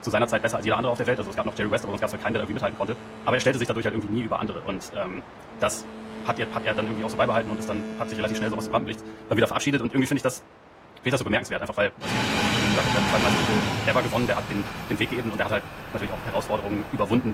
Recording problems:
wrong speed, natural pitch; too fast; 1.7 times normal speed
garbled, watery; slightly; nothing above 15.5 kHz
train or aircraft noise; loud; throughout; 3 dB below the speech
abrupt cut into speech; at the end

